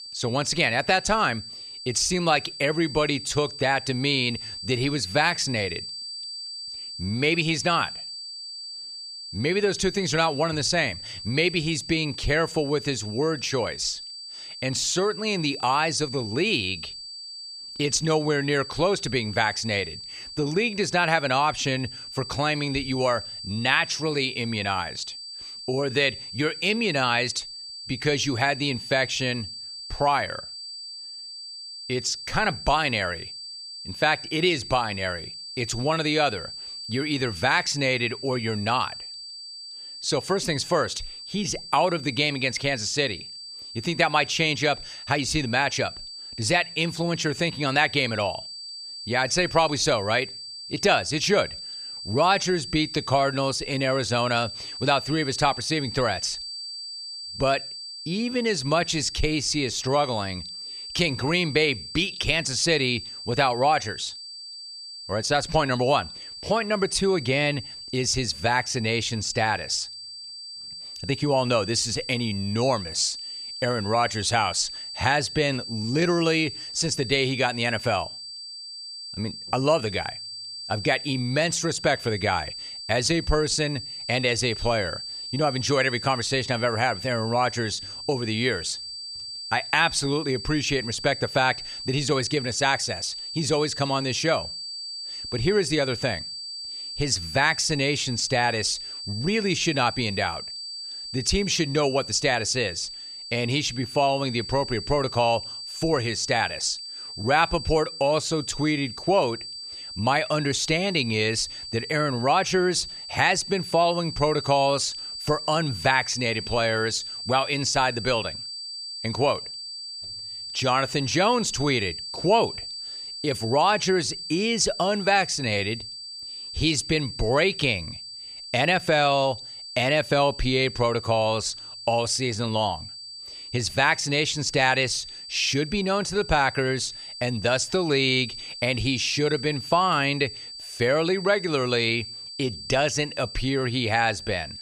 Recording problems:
high-pitched whine; loud; throughout; 4.5 kHz, 10 dB below the speech

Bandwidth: 14.5 kHz